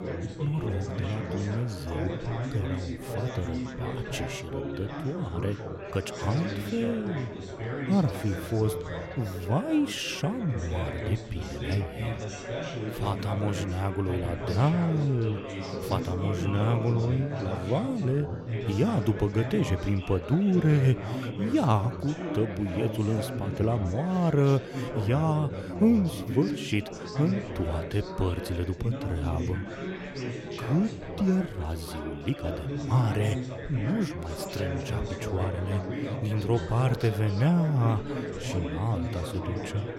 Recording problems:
chatter from many people; loud; throughout; 6 dB below the speech

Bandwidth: 16 kHz